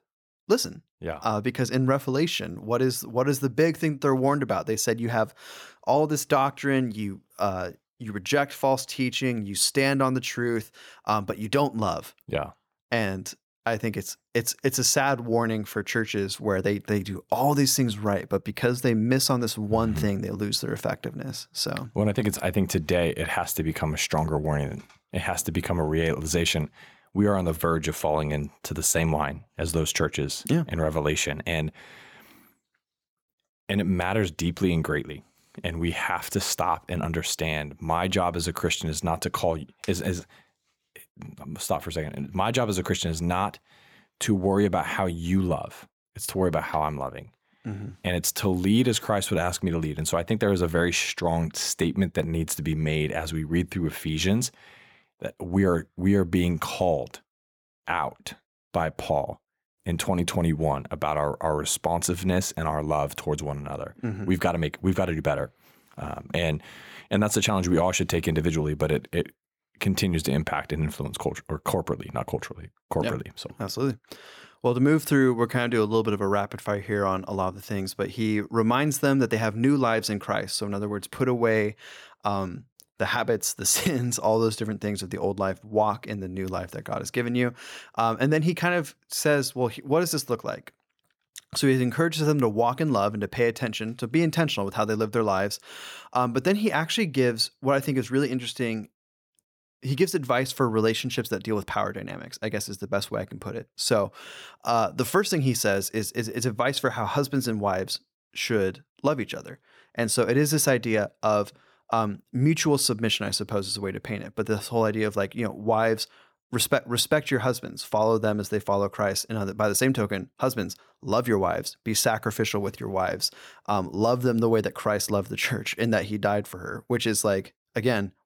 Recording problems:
none

